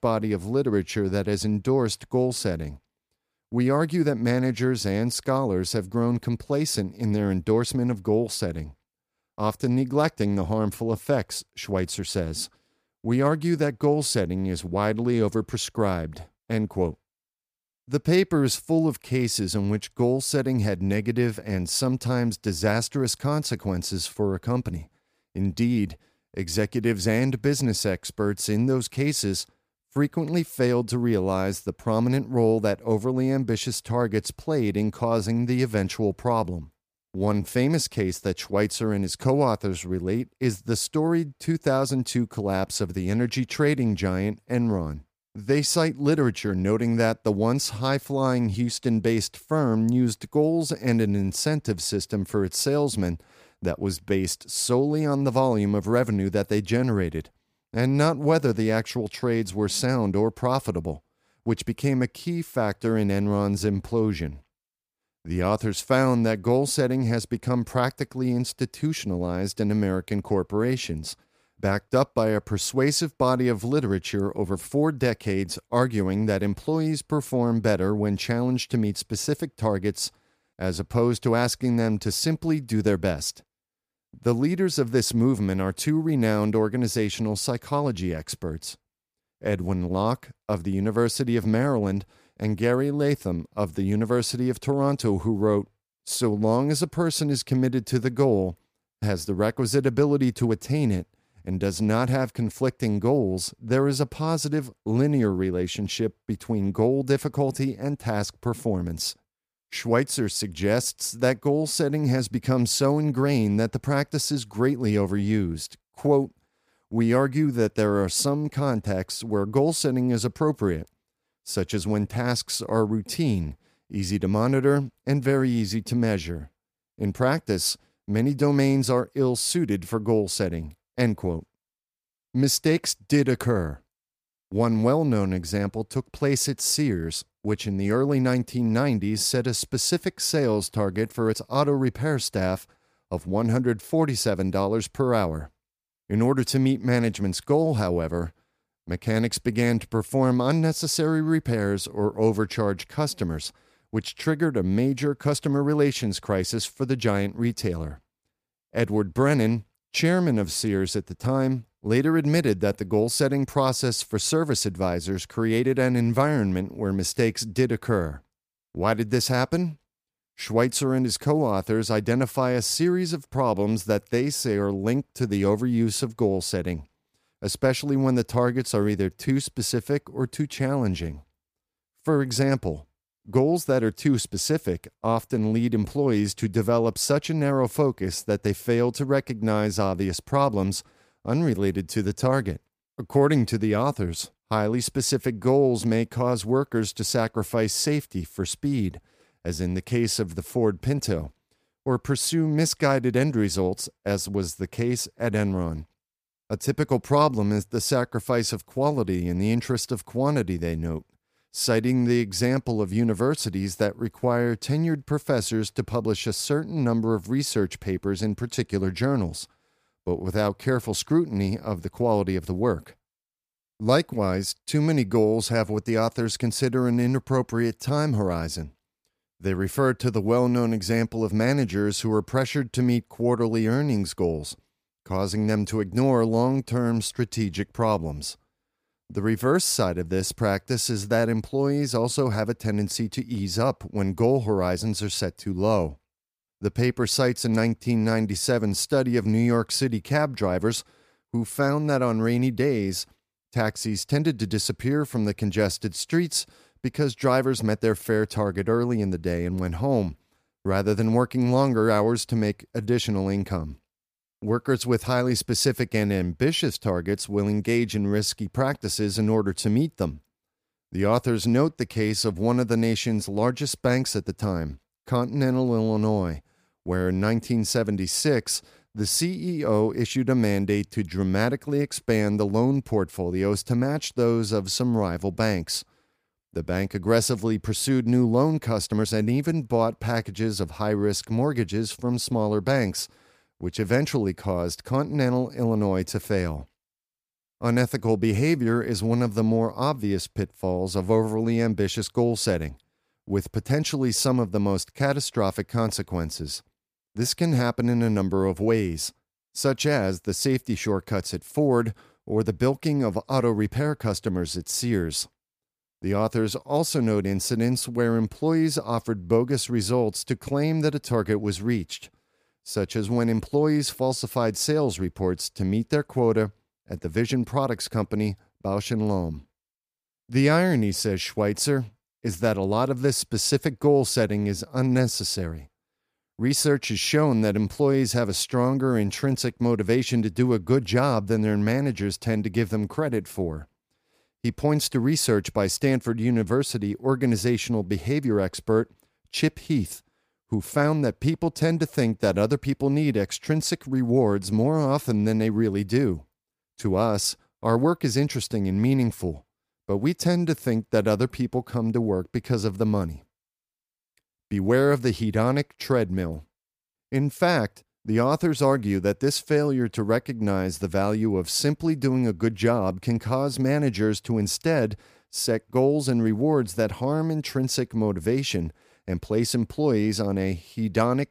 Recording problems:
uneven, jittery; slightly; from 37 s to 5:58

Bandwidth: 15 kHz